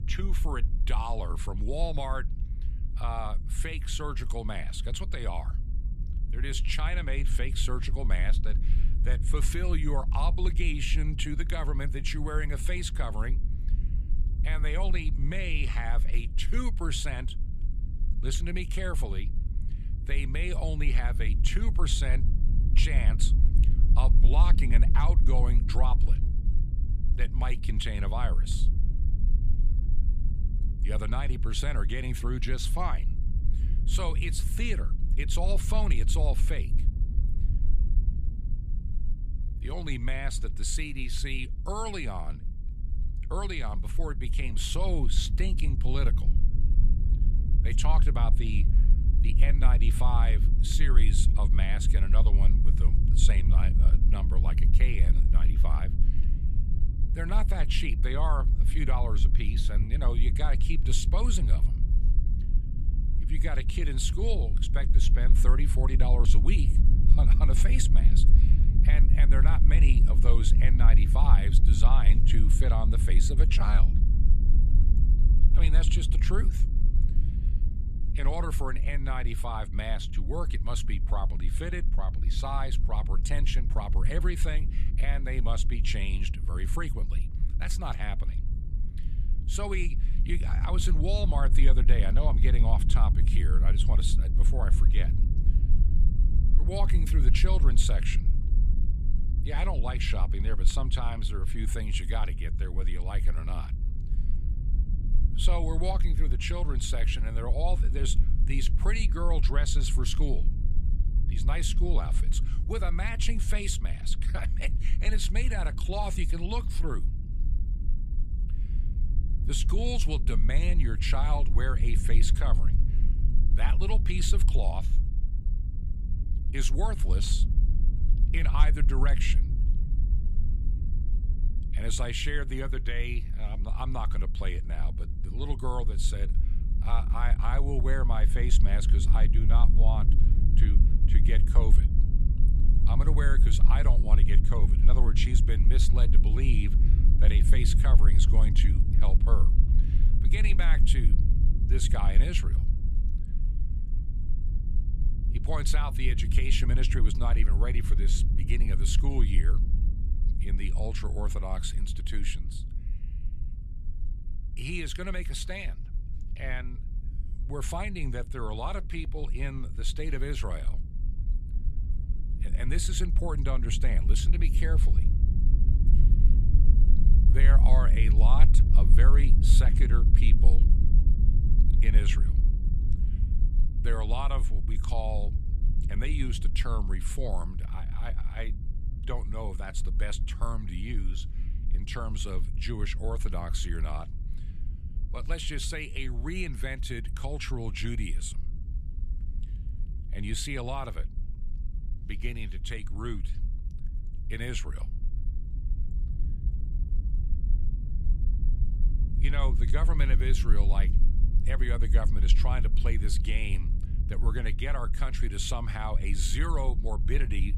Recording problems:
low rumble; noticeable; throughout; 10 dB below the speech

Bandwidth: 14.5 kHz